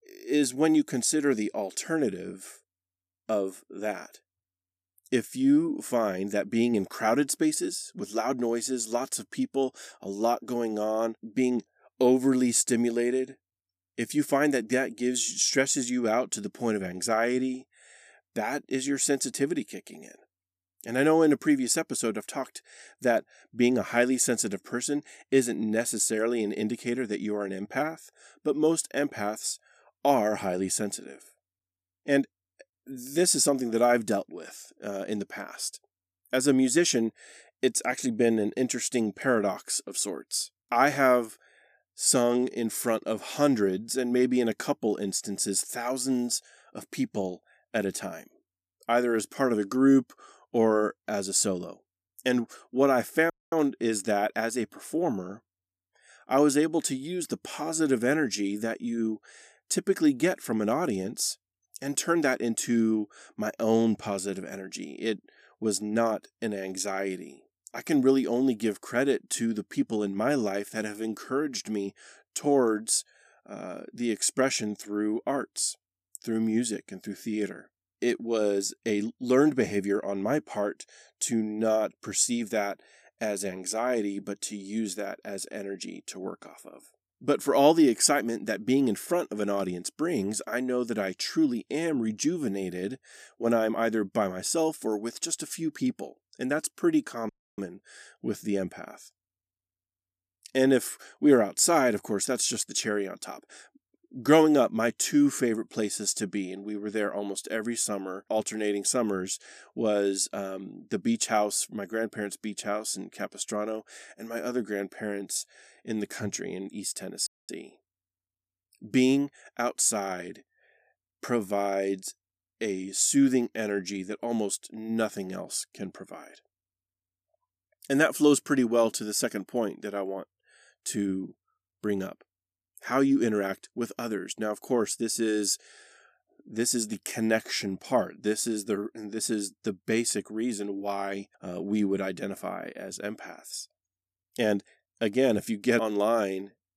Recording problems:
audio cutting out; at 53 s, at 1:37 and at 1:57

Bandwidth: 14.5 kHz